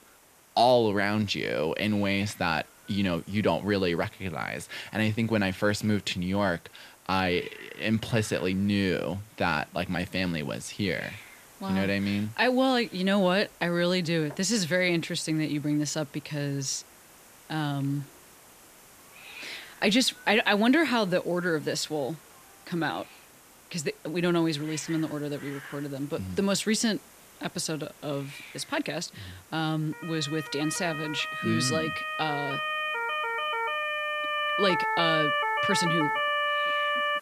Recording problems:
hiss; faint; throughout; 20 dB below the speech
siren; loud; from 30 s on; peak 3 dB above the speech

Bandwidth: 14.5 kHz